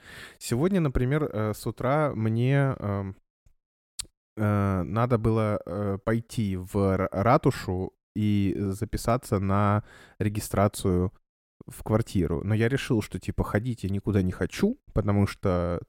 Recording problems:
none

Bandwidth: 16.5 kHz